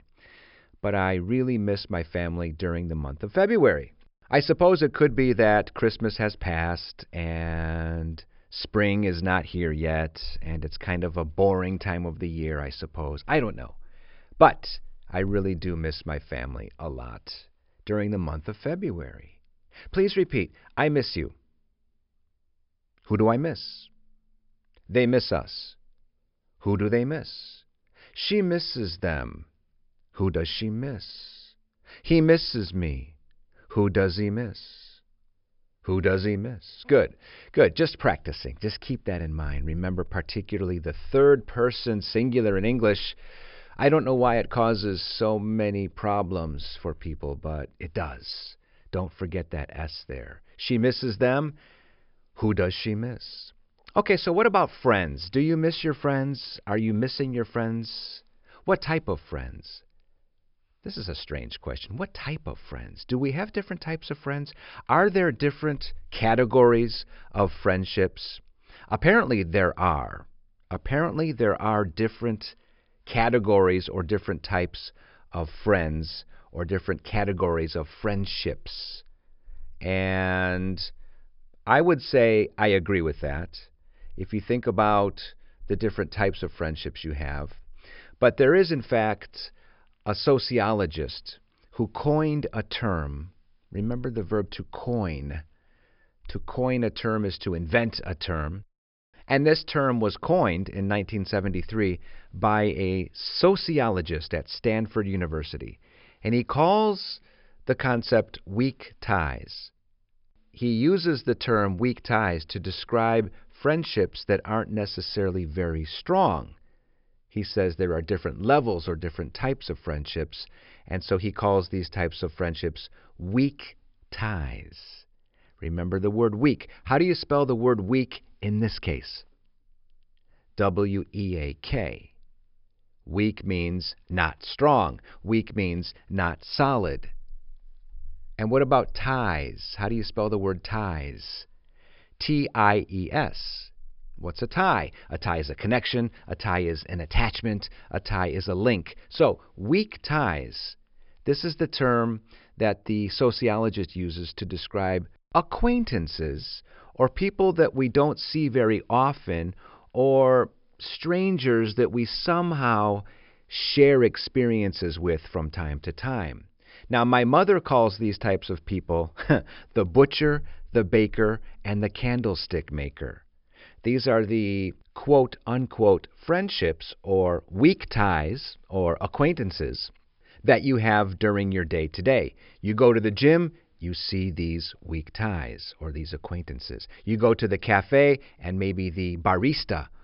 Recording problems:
high frequencies cut off; noticeable; nothing above 5 kHz

